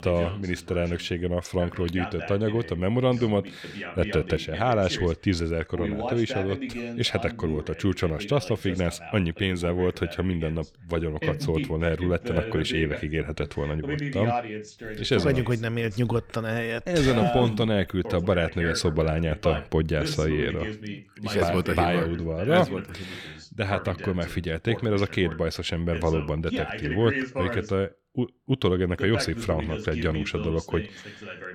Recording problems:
voice in the background; loud; throughout; 8 dB below the speech

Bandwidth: 17.5 kHz